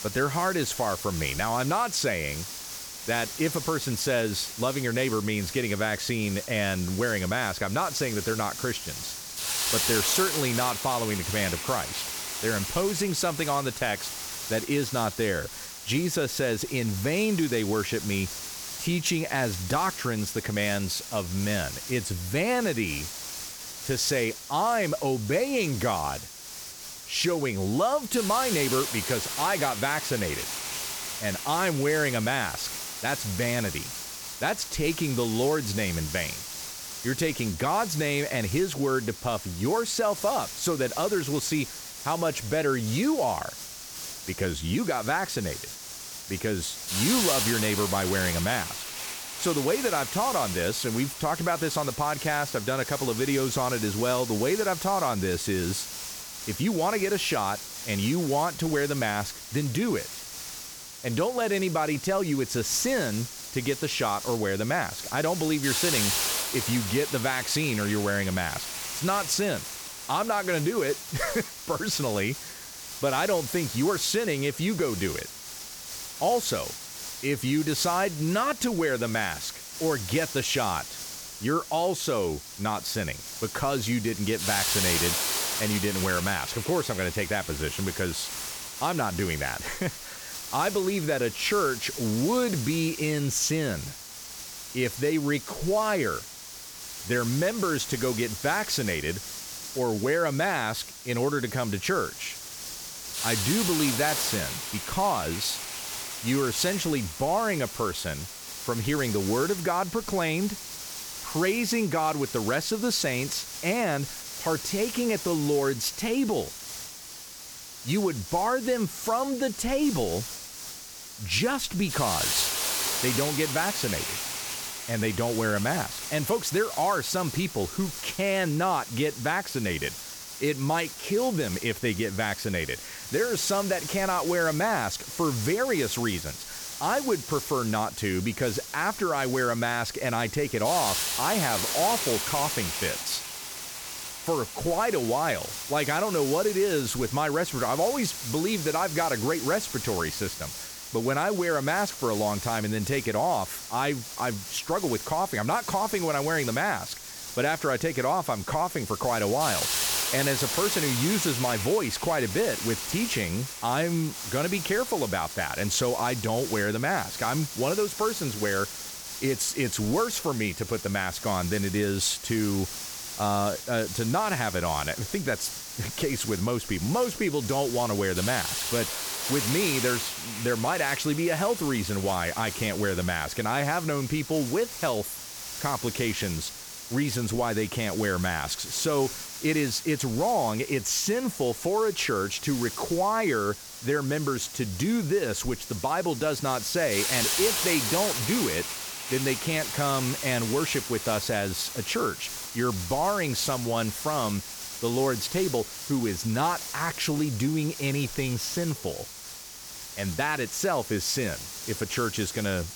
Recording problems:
hiss; loud; throughout; 6 dB below the speech

